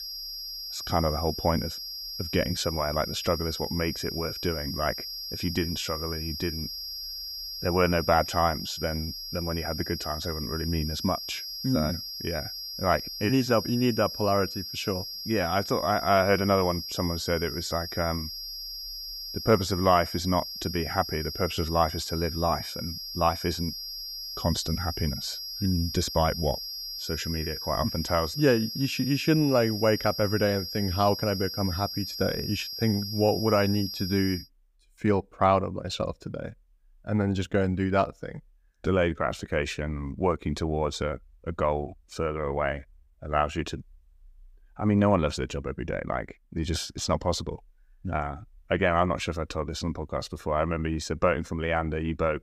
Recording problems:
high-pitched whine; loud; until 34 s; 5 kHz, 6 dB below the speech

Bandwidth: 15.5 kHz